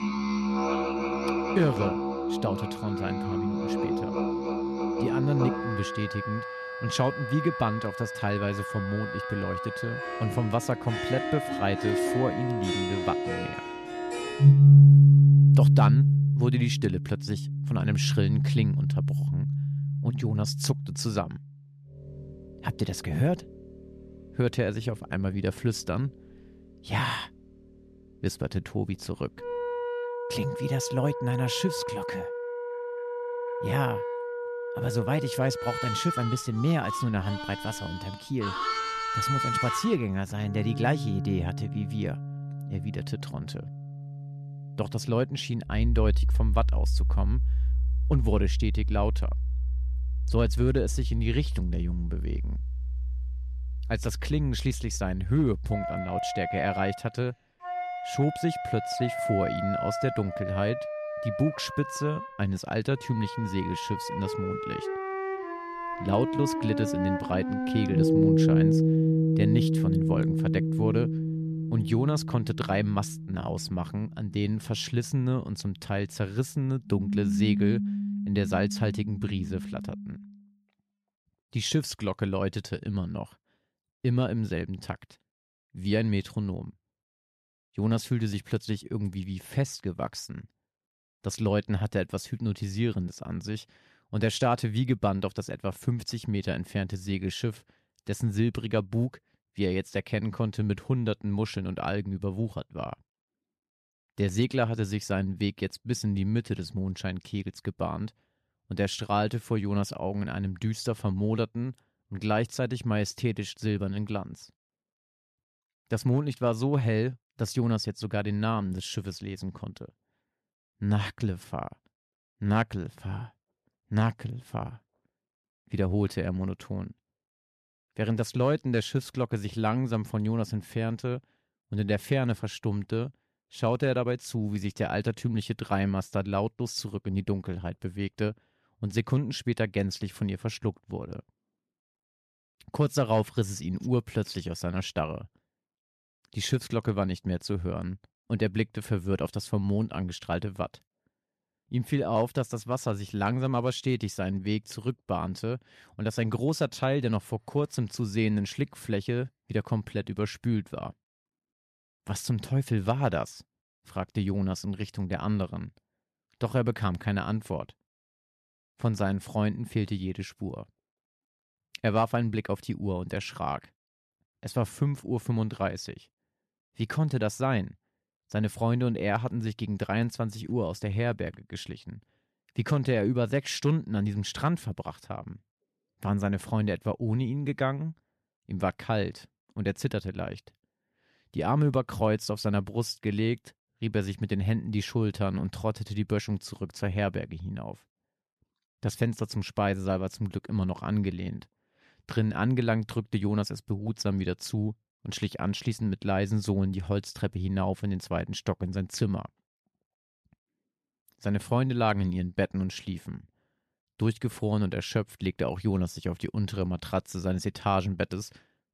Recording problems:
background music; very loud; until 1:20; 3 dB above the speech

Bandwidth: 13.5 kHz